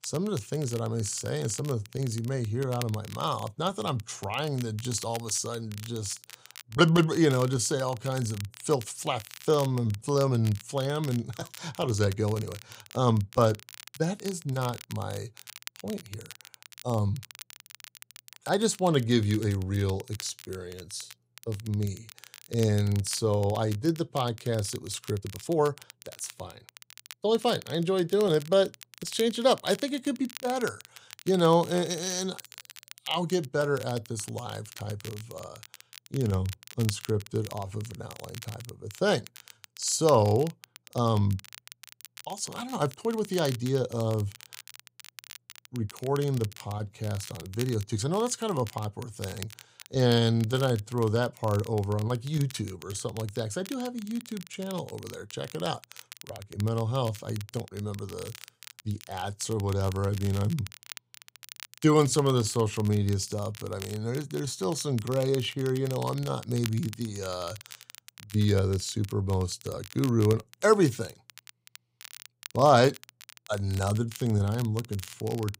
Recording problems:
crackle, like an old record; noticeable; 15 dB below the speech
uneven, jittery; strongly; from 6.5 s to 1:10

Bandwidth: 15.5 kHz